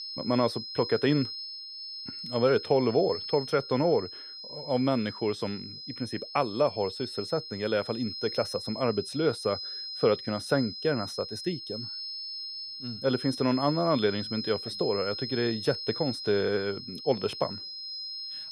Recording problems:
high-pitched whine; loud; throughout; 5 kHz, 8 dB below the speech

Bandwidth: 15 kHz